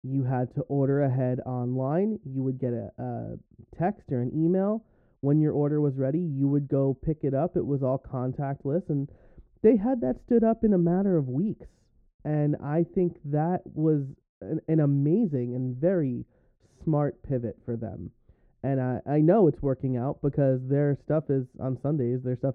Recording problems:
muffled; very; fading above 1.5 kHz

